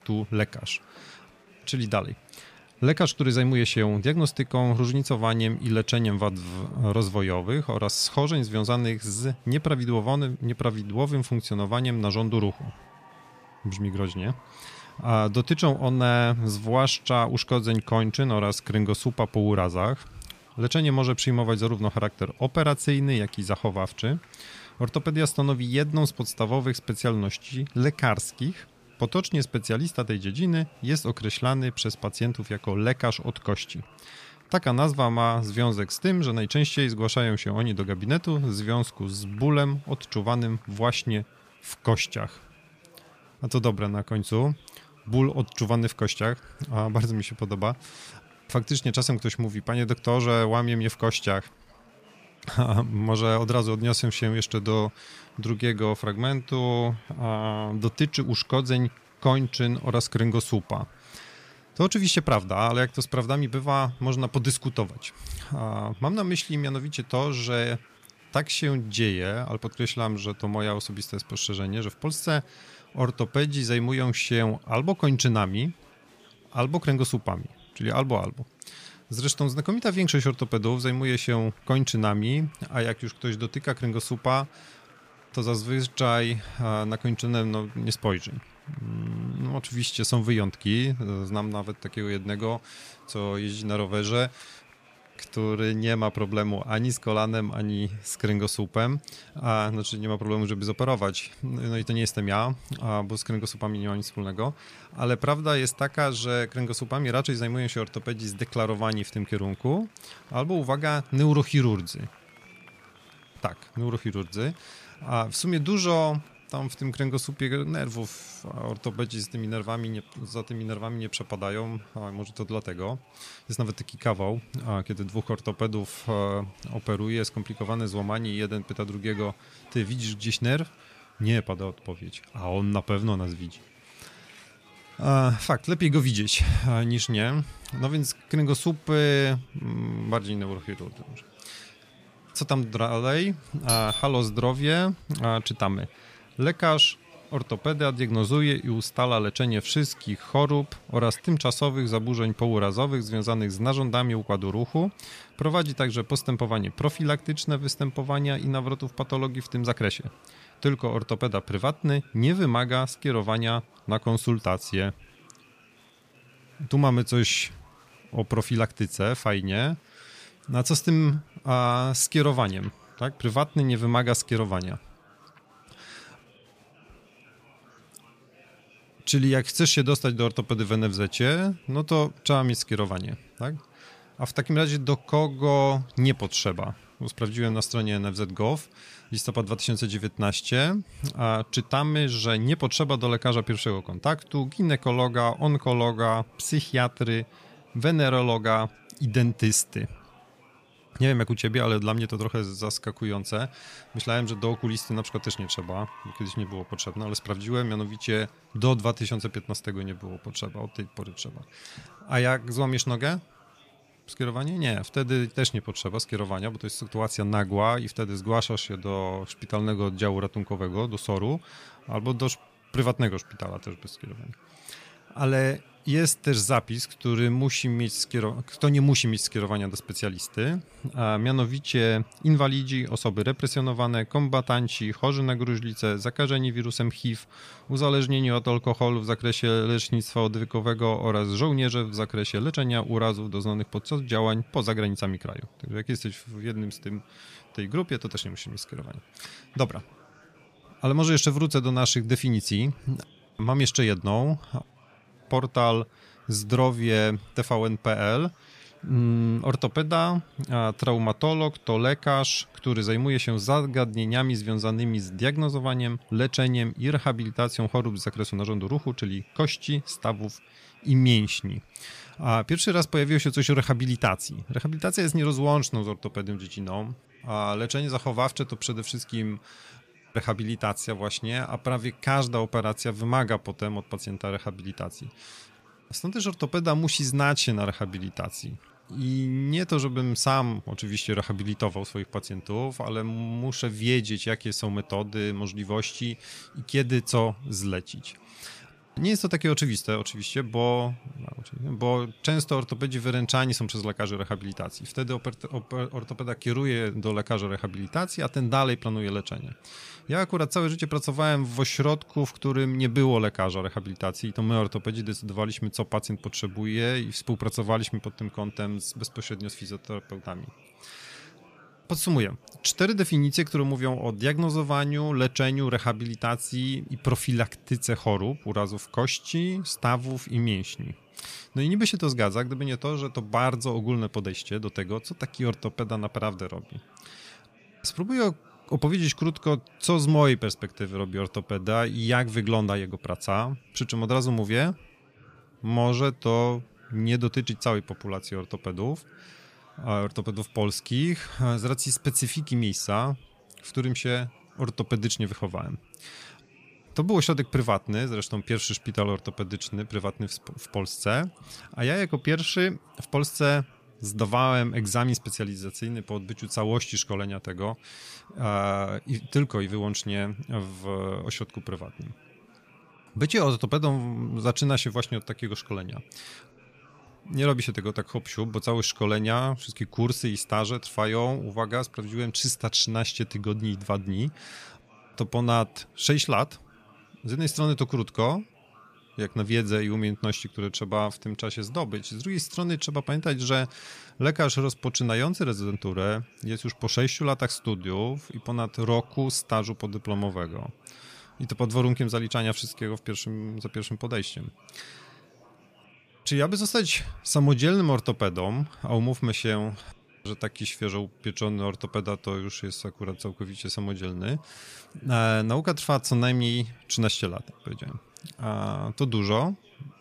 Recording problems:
murmuring crowd; faint; throughout; 30 dB below the speech
doorbell; loud; at 2:24; peak 1 dB above the speech

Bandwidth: 15 kHz